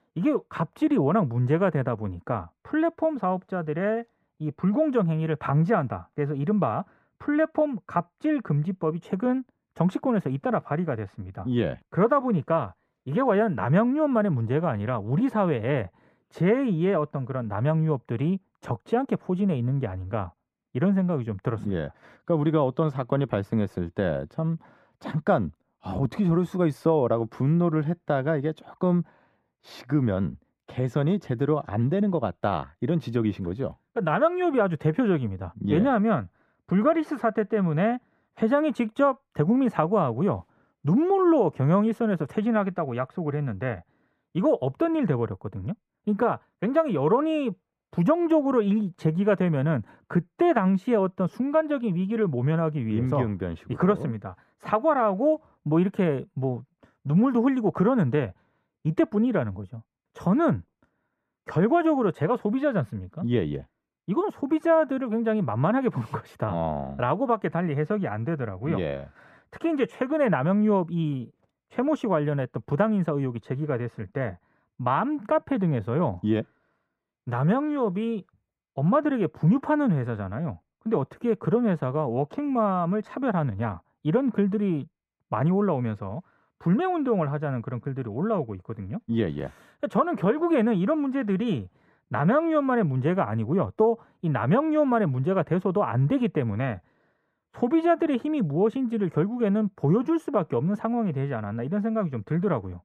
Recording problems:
muffled; very; fading above 3 kHz

